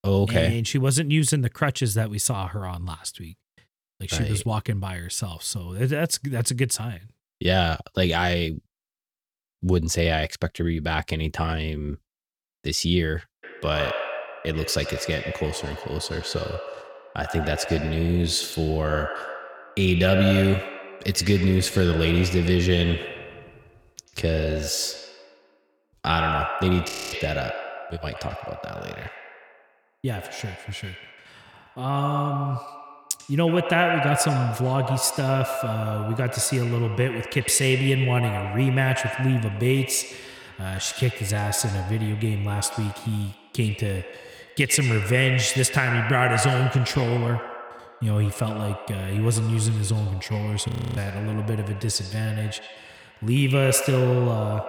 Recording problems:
echo of what is said; strong; from 13 s on; 90 ms later, 8 dB below the speech
audio freezing; at 27 s and at 51 s

